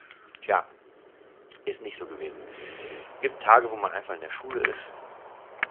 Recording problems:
phone-call audio; nothing above 3 kHz
wind in the background; noticeable; throughout; 10 dB below the speech

